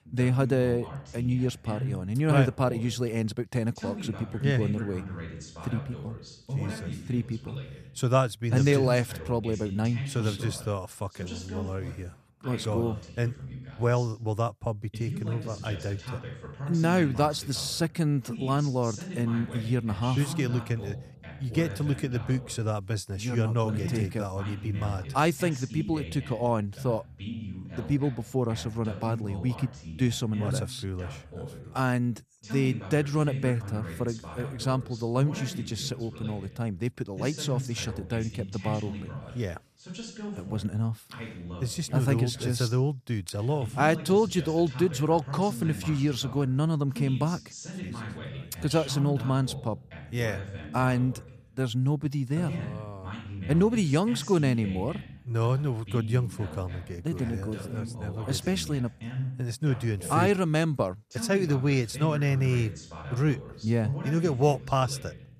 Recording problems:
voice in the background; noticeable; throughout; 10 dB below the speech

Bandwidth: 14.5 kHz